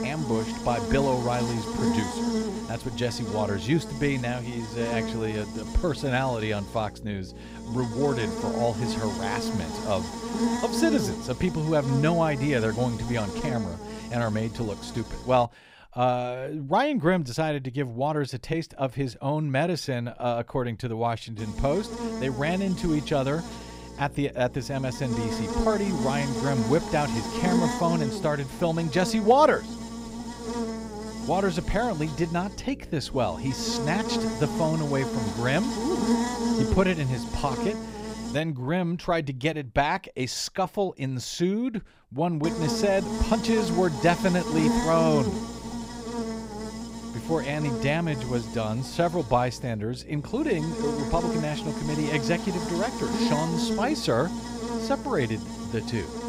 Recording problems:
electrical hum; loud; until 15 s, from 21 to 38 s and from 42 s on; 60 Hz, 6 dB below the speech

